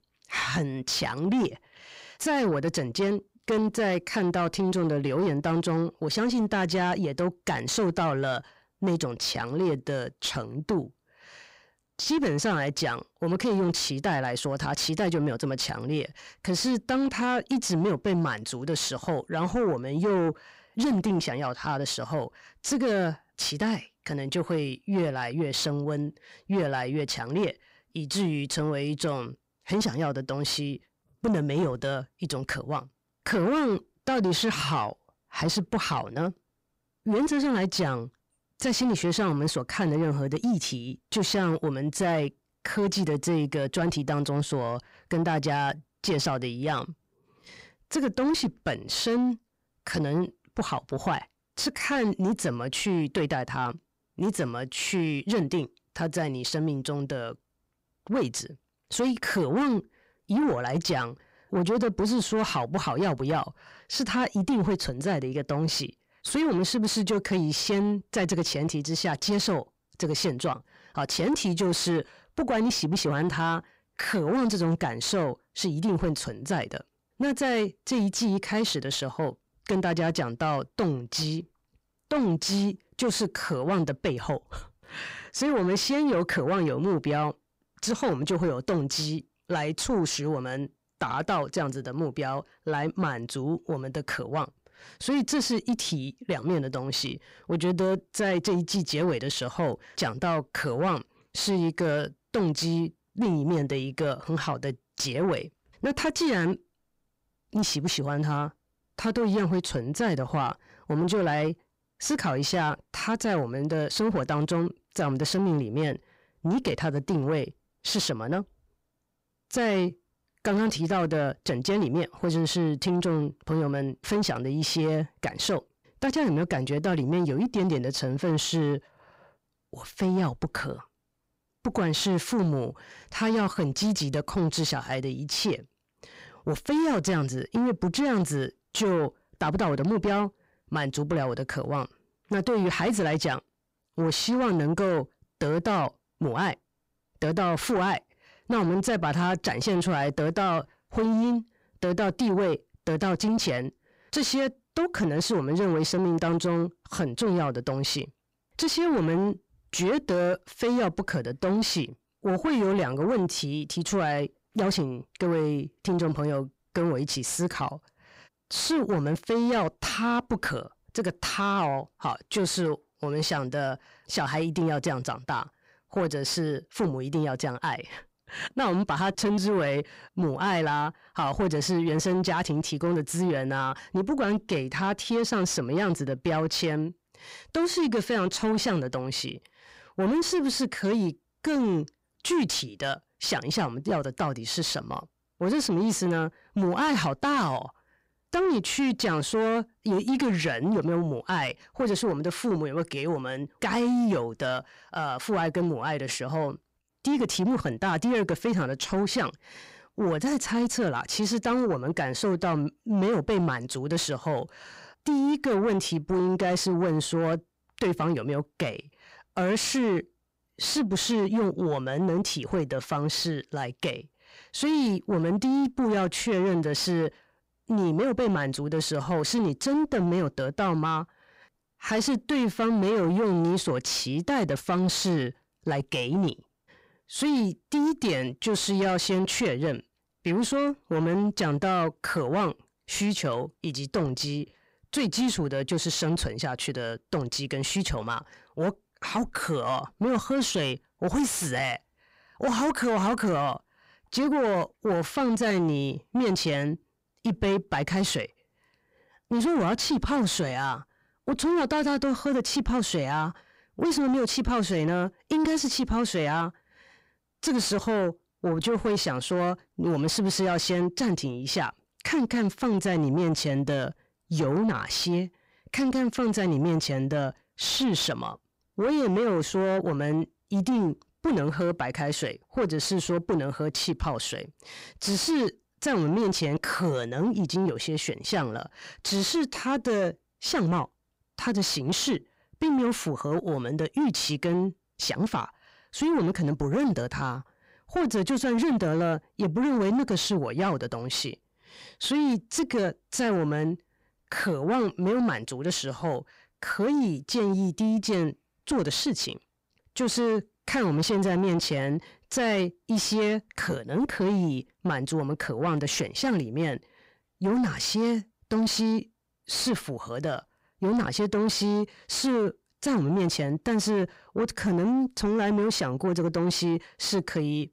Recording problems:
distortion; slight; 10 dB below the speech

